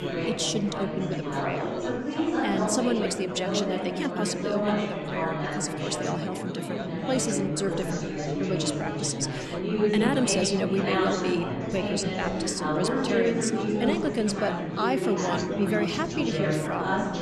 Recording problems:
chatter from many people; very loud; throughout; 1 dB above the speech

